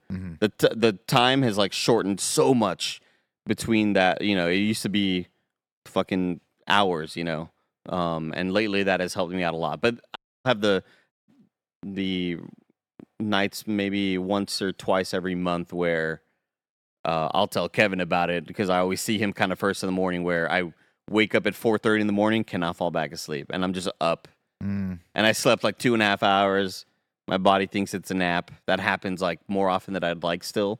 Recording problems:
audio cutting out; at 10 s and at 11 s

